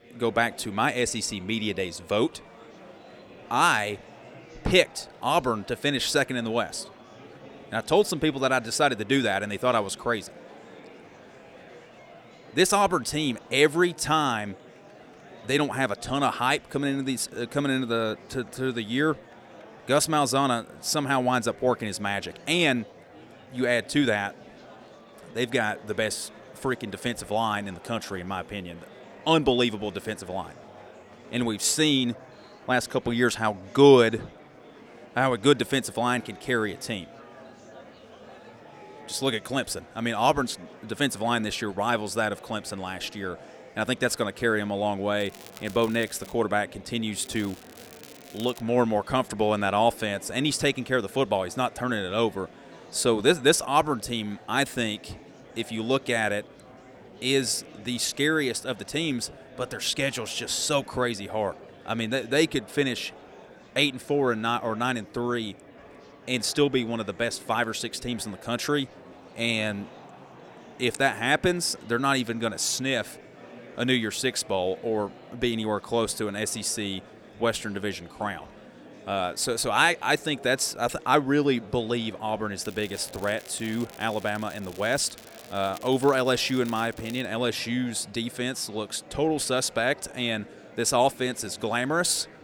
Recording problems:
murmuring crowd; faint; throughout; 20 dB below the speech
crackling; faint; from 45 to 46 s, from 47 to 49 s and from 1:23 to 1:27; 20 dB below the speech

